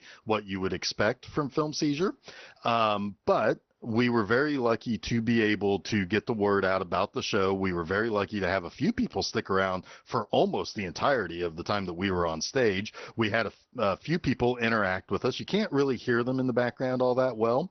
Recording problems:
garbled, watery; slightly; nothing above 6 kHz

